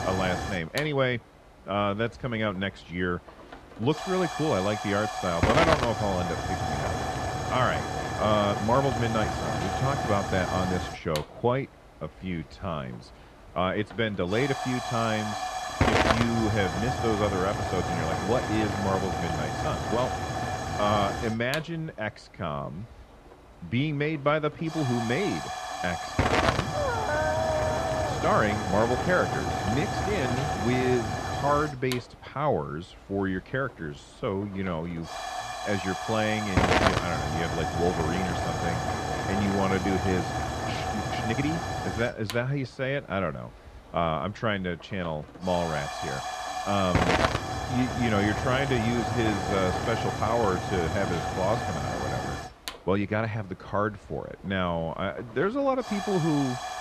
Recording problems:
muffled; very; fading above 2 kHz
hiss; loud; throughout; 1 dB below the speech
uneven, jittery; strongly; from 1.5 to 56 s
dog barking; loud; from 27 to 28 s; peak 1 dB above the speech

